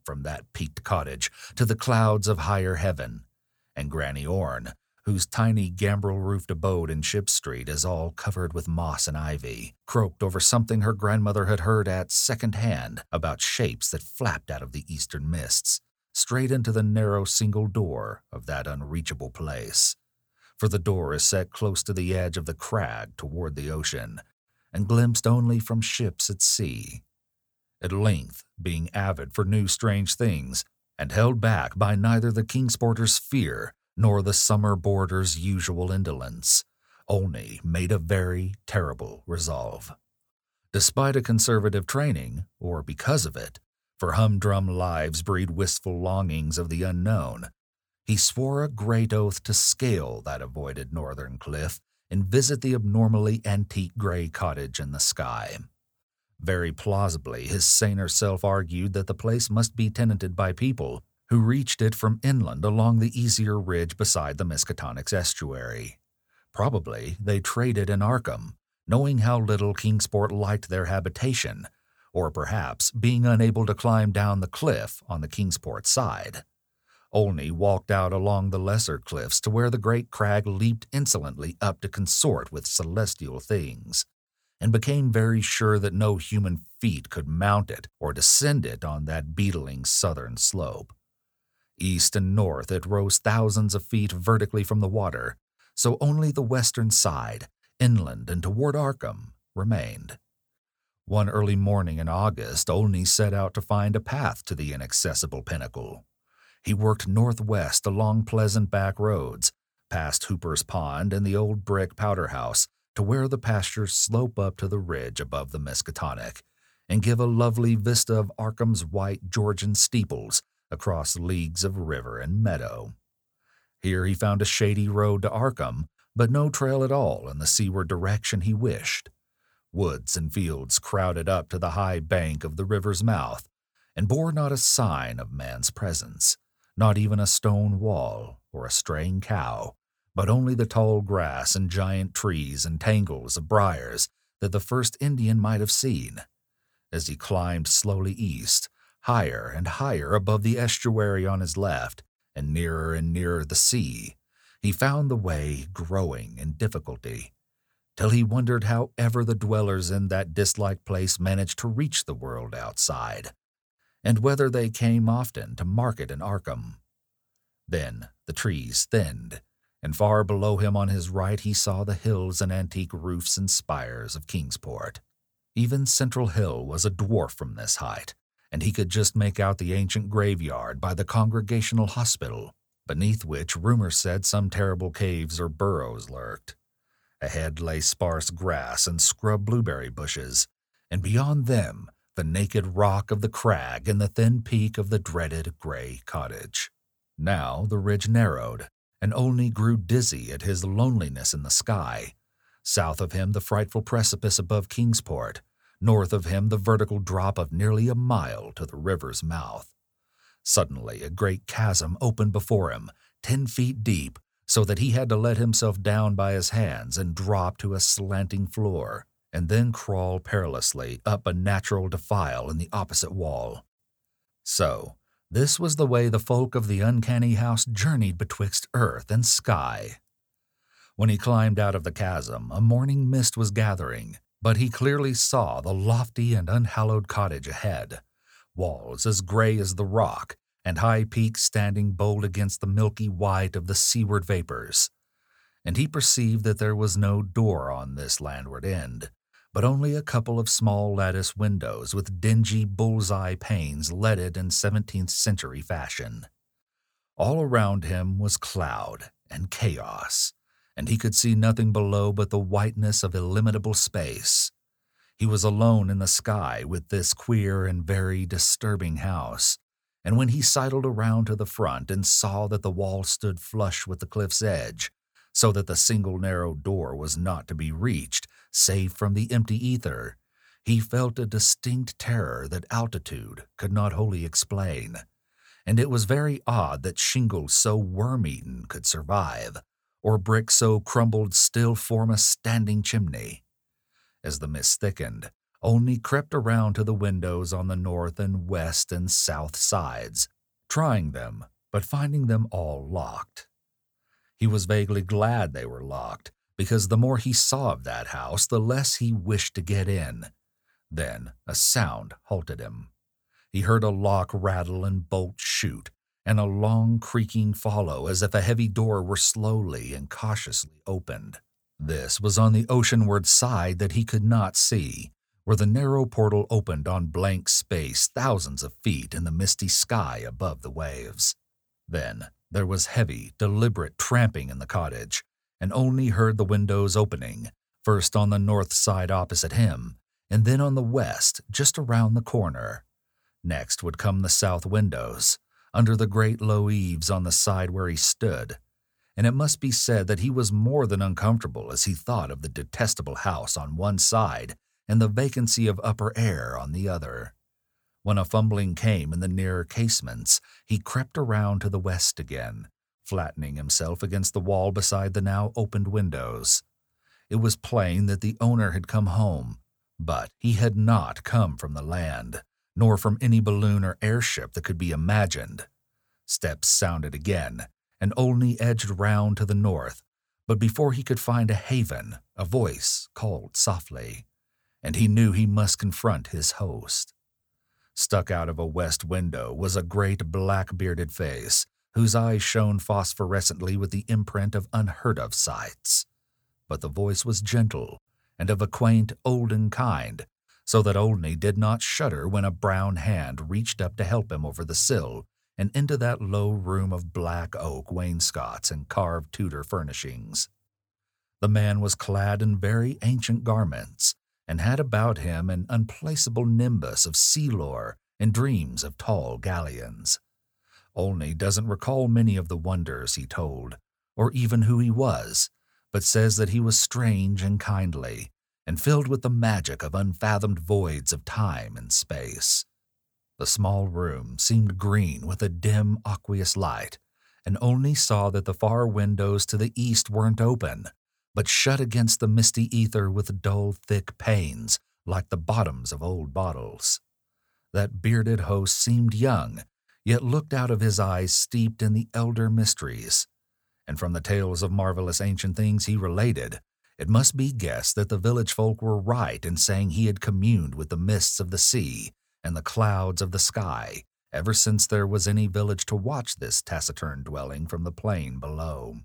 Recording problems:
none

